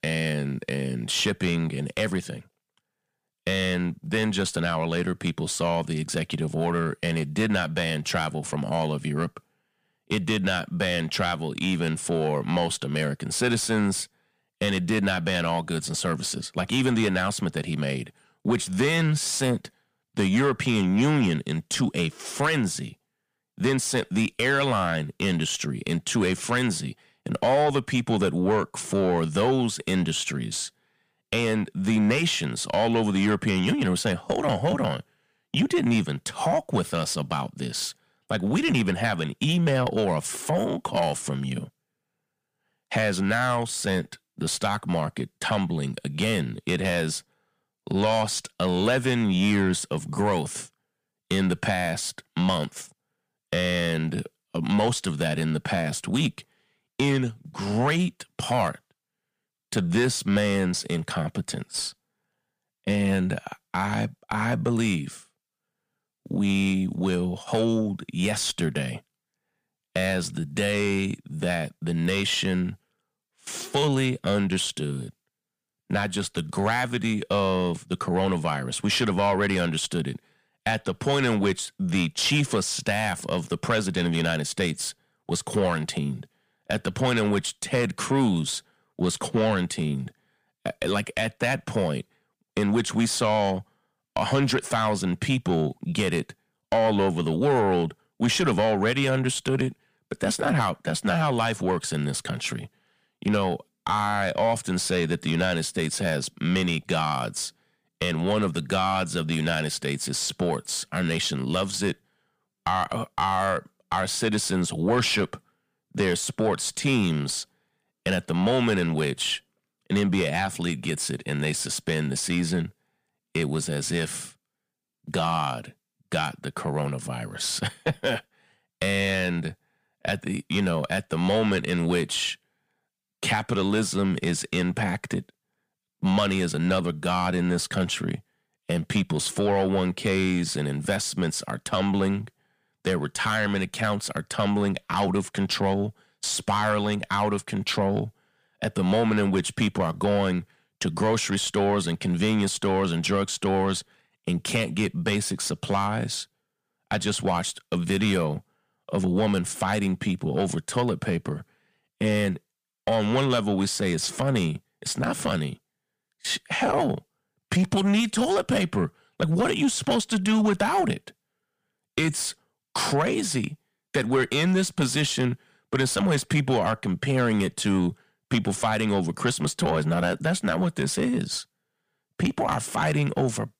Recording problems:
distortion; slight; 10 dB below the speech

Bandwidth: 15 kHz